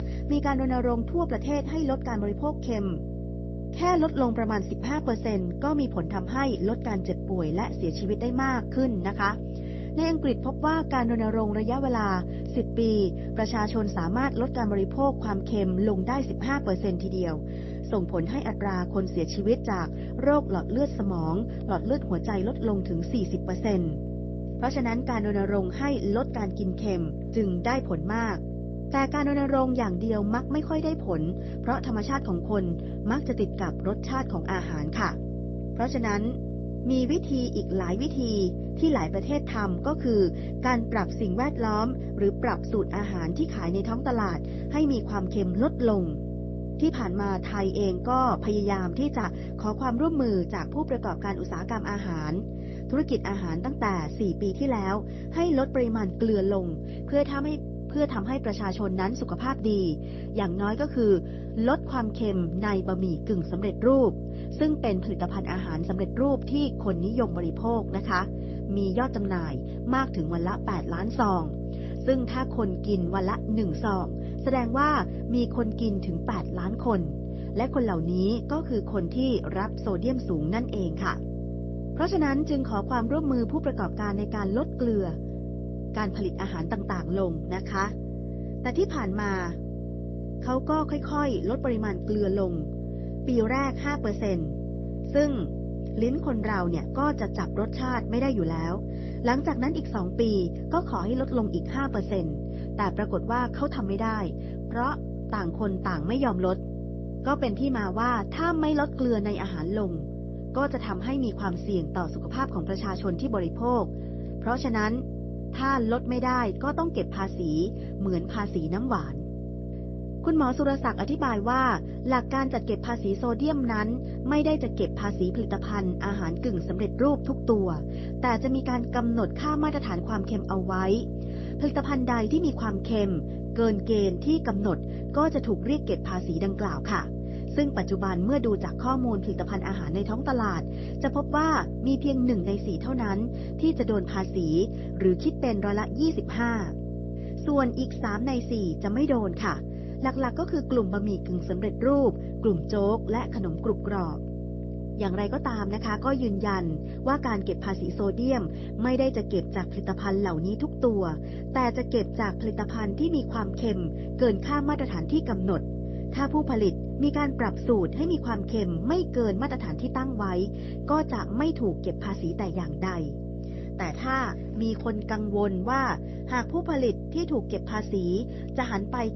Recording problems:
garbled, watery; slightly; nothing above 6 kHz
electrical hum; noticeable; throughout; 60 Hz, 10 dB below the speech

